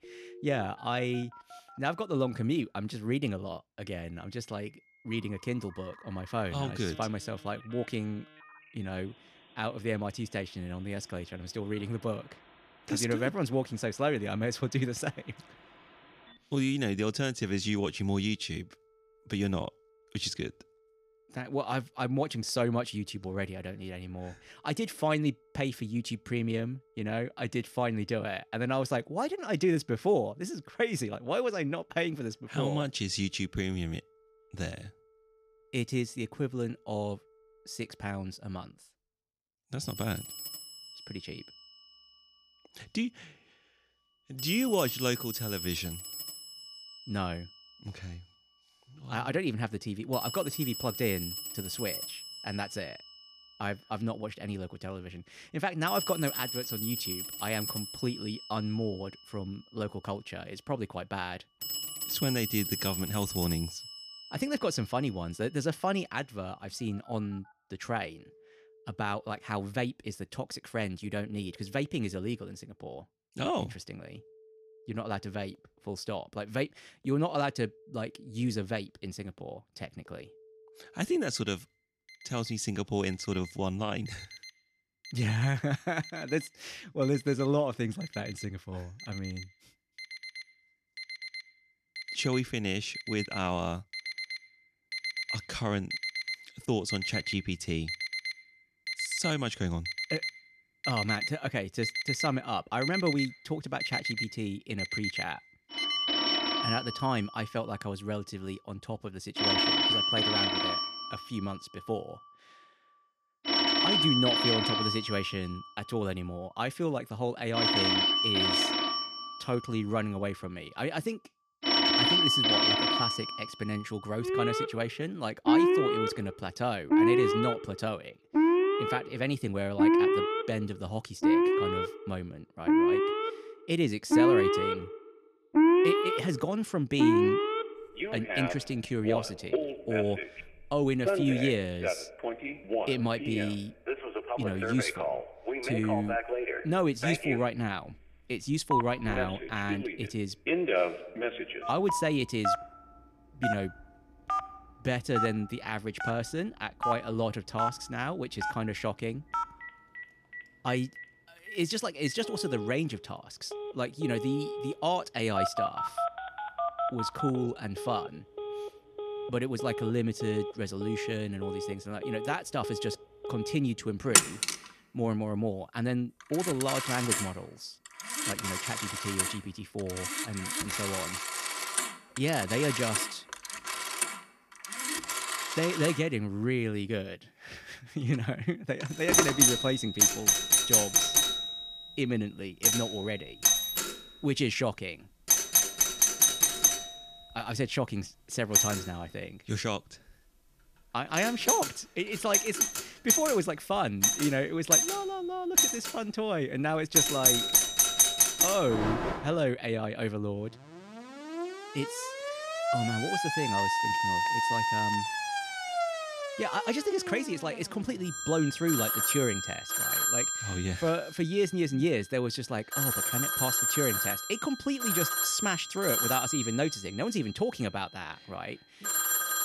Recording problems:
alarms or sirens; very loud; throughout; 4 dB above the speech

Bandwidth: 14.5 kHz